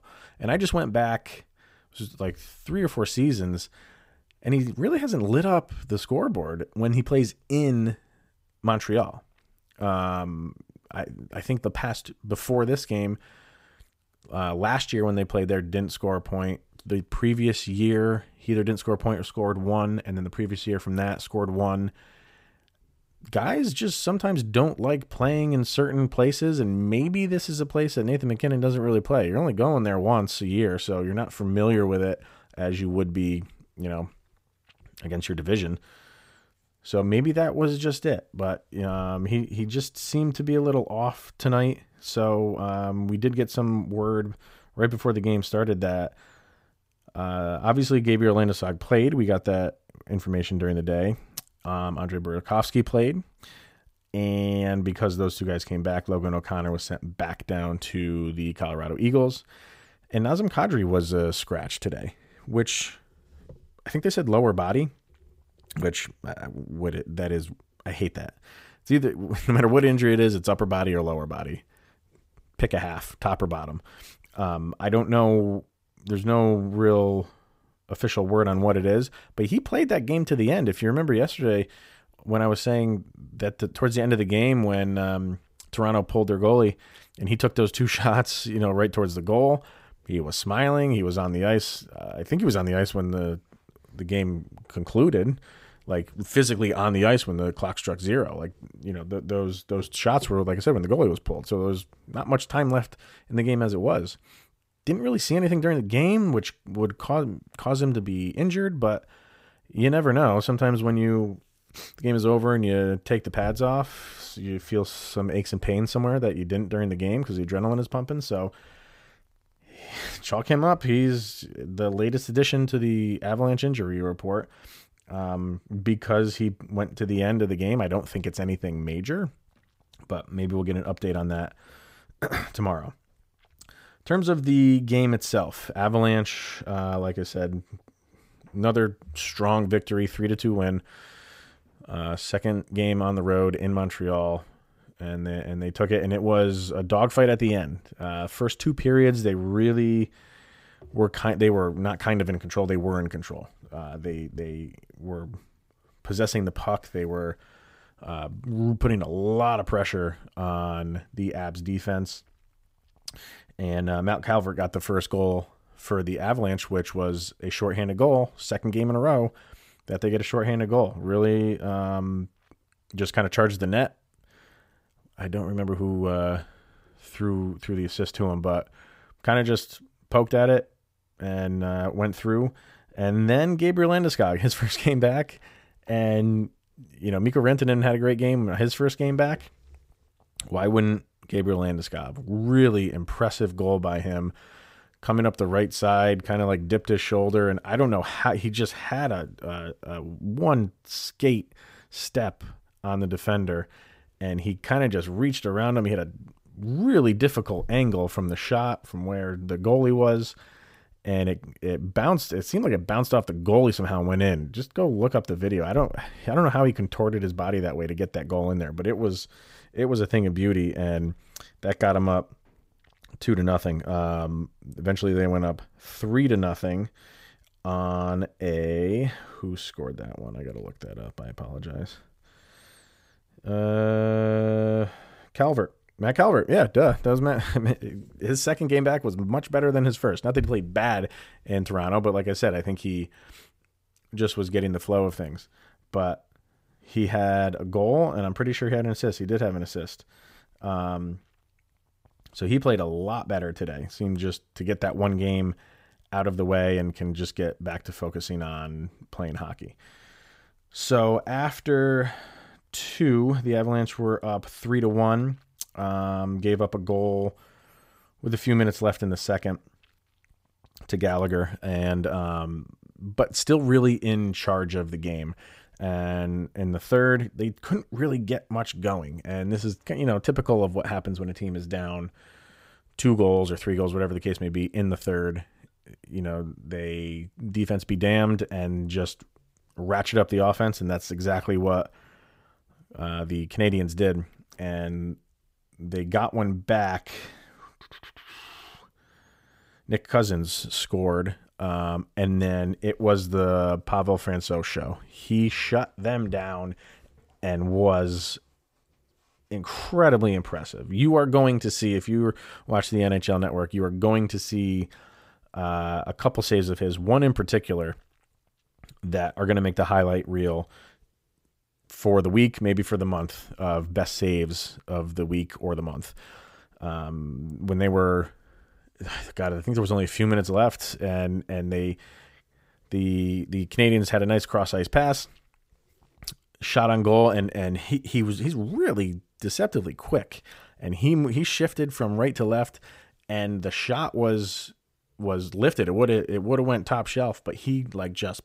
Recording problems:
none

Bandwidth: 15.5 kHz